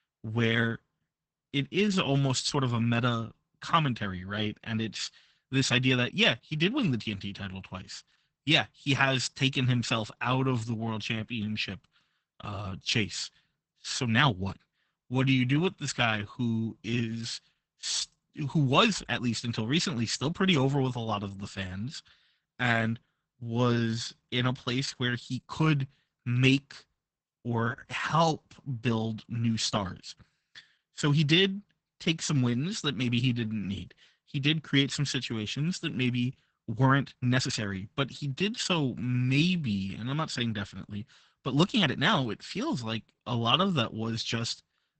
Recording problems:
garbled, watery; badly; nothing above 8 kHz
uneven, jittery; strongly; from 1.5 to 44 s

